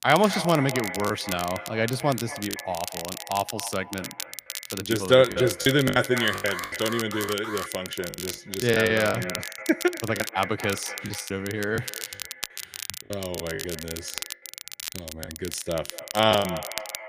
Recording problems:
echo of what is said; strong; throughout; 240 ms later, 10 dB below the speech
crackle, like an old record; loud; 10 dB below the speech
choppy; very; 9% of the speech affected
alarm; noticeable; from 6 to 7.5 s; peak 9 dB below the speech

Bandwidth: 15 kHz